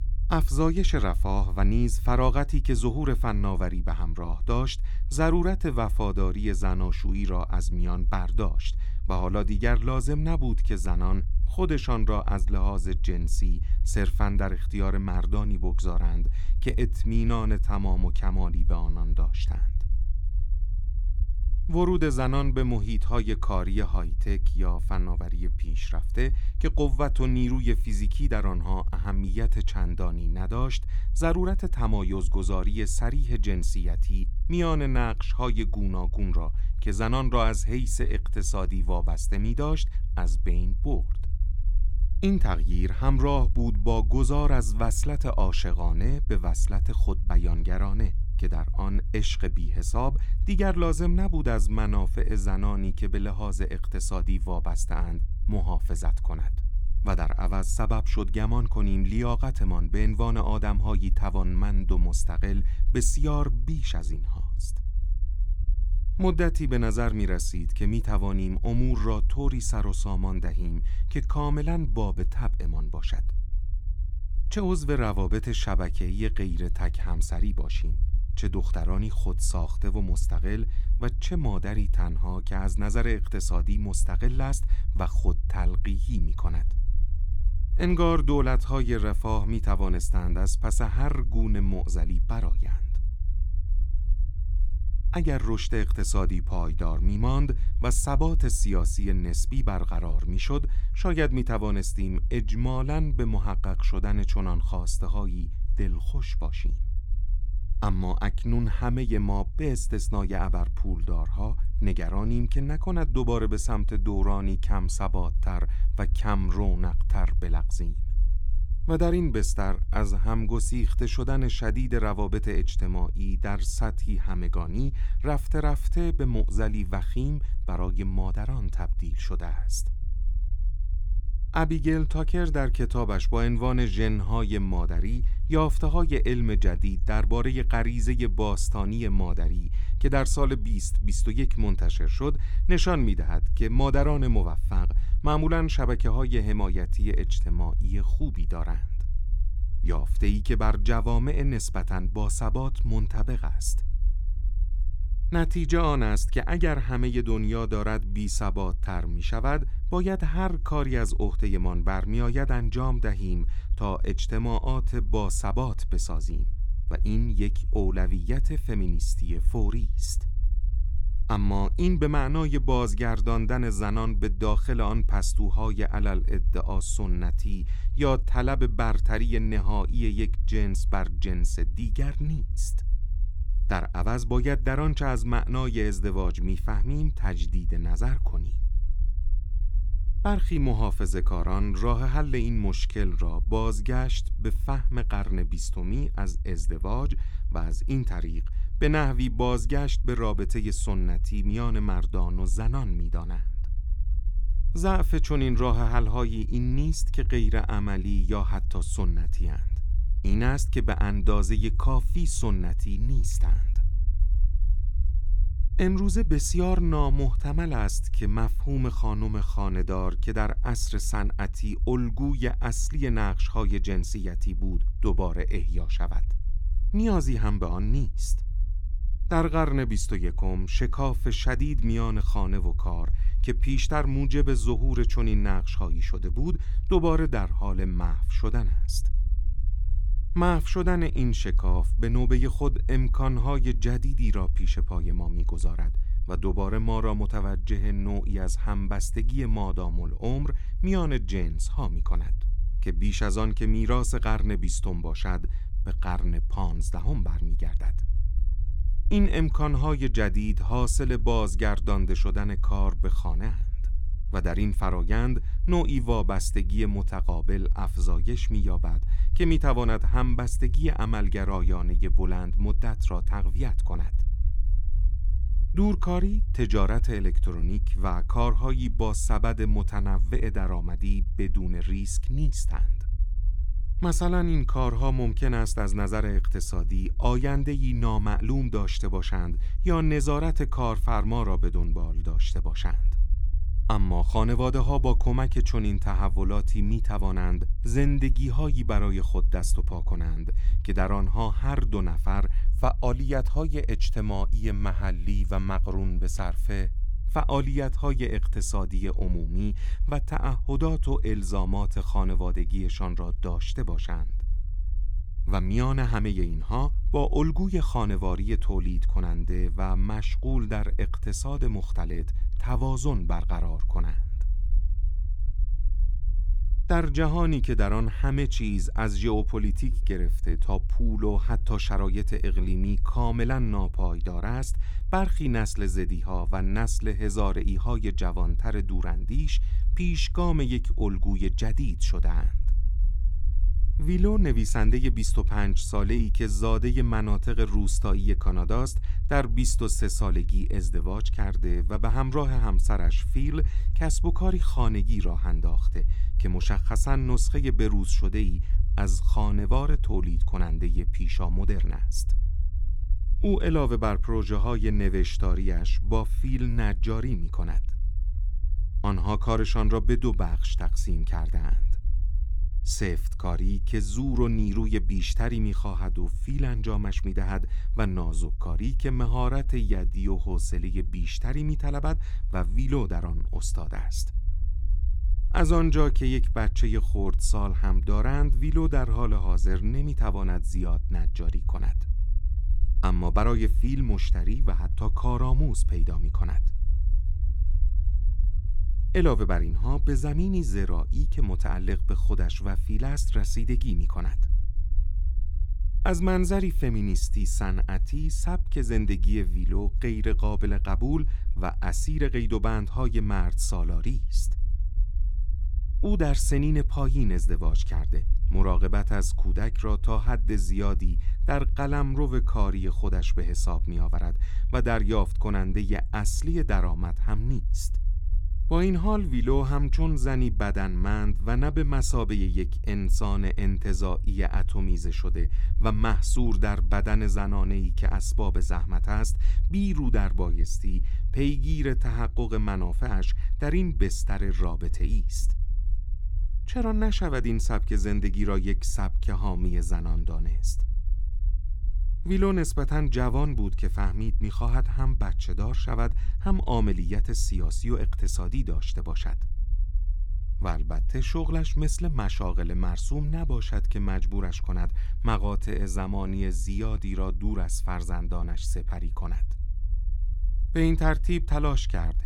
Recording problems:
low rumble; noticeable; throughout; 20 dB below the speech

